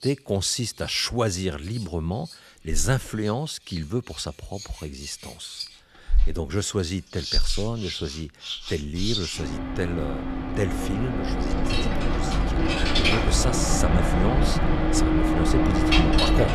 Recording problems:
household noises; very loud; throughout; 3 dB above the speech

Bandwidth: 13.5 kHz